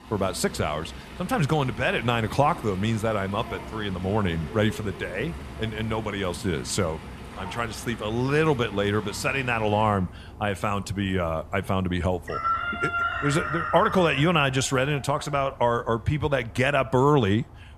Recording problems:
animal sounds; loud; throughout; 10 dB below the speech

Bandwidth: 14 kHz